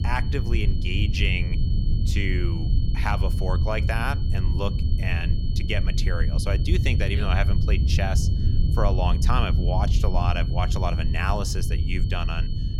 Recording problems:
low rumble; loud; throughout; 10 dB below the speech
high-pitched whine; noticeable; throughout; 4.5 kHz, 15 dB below the speech

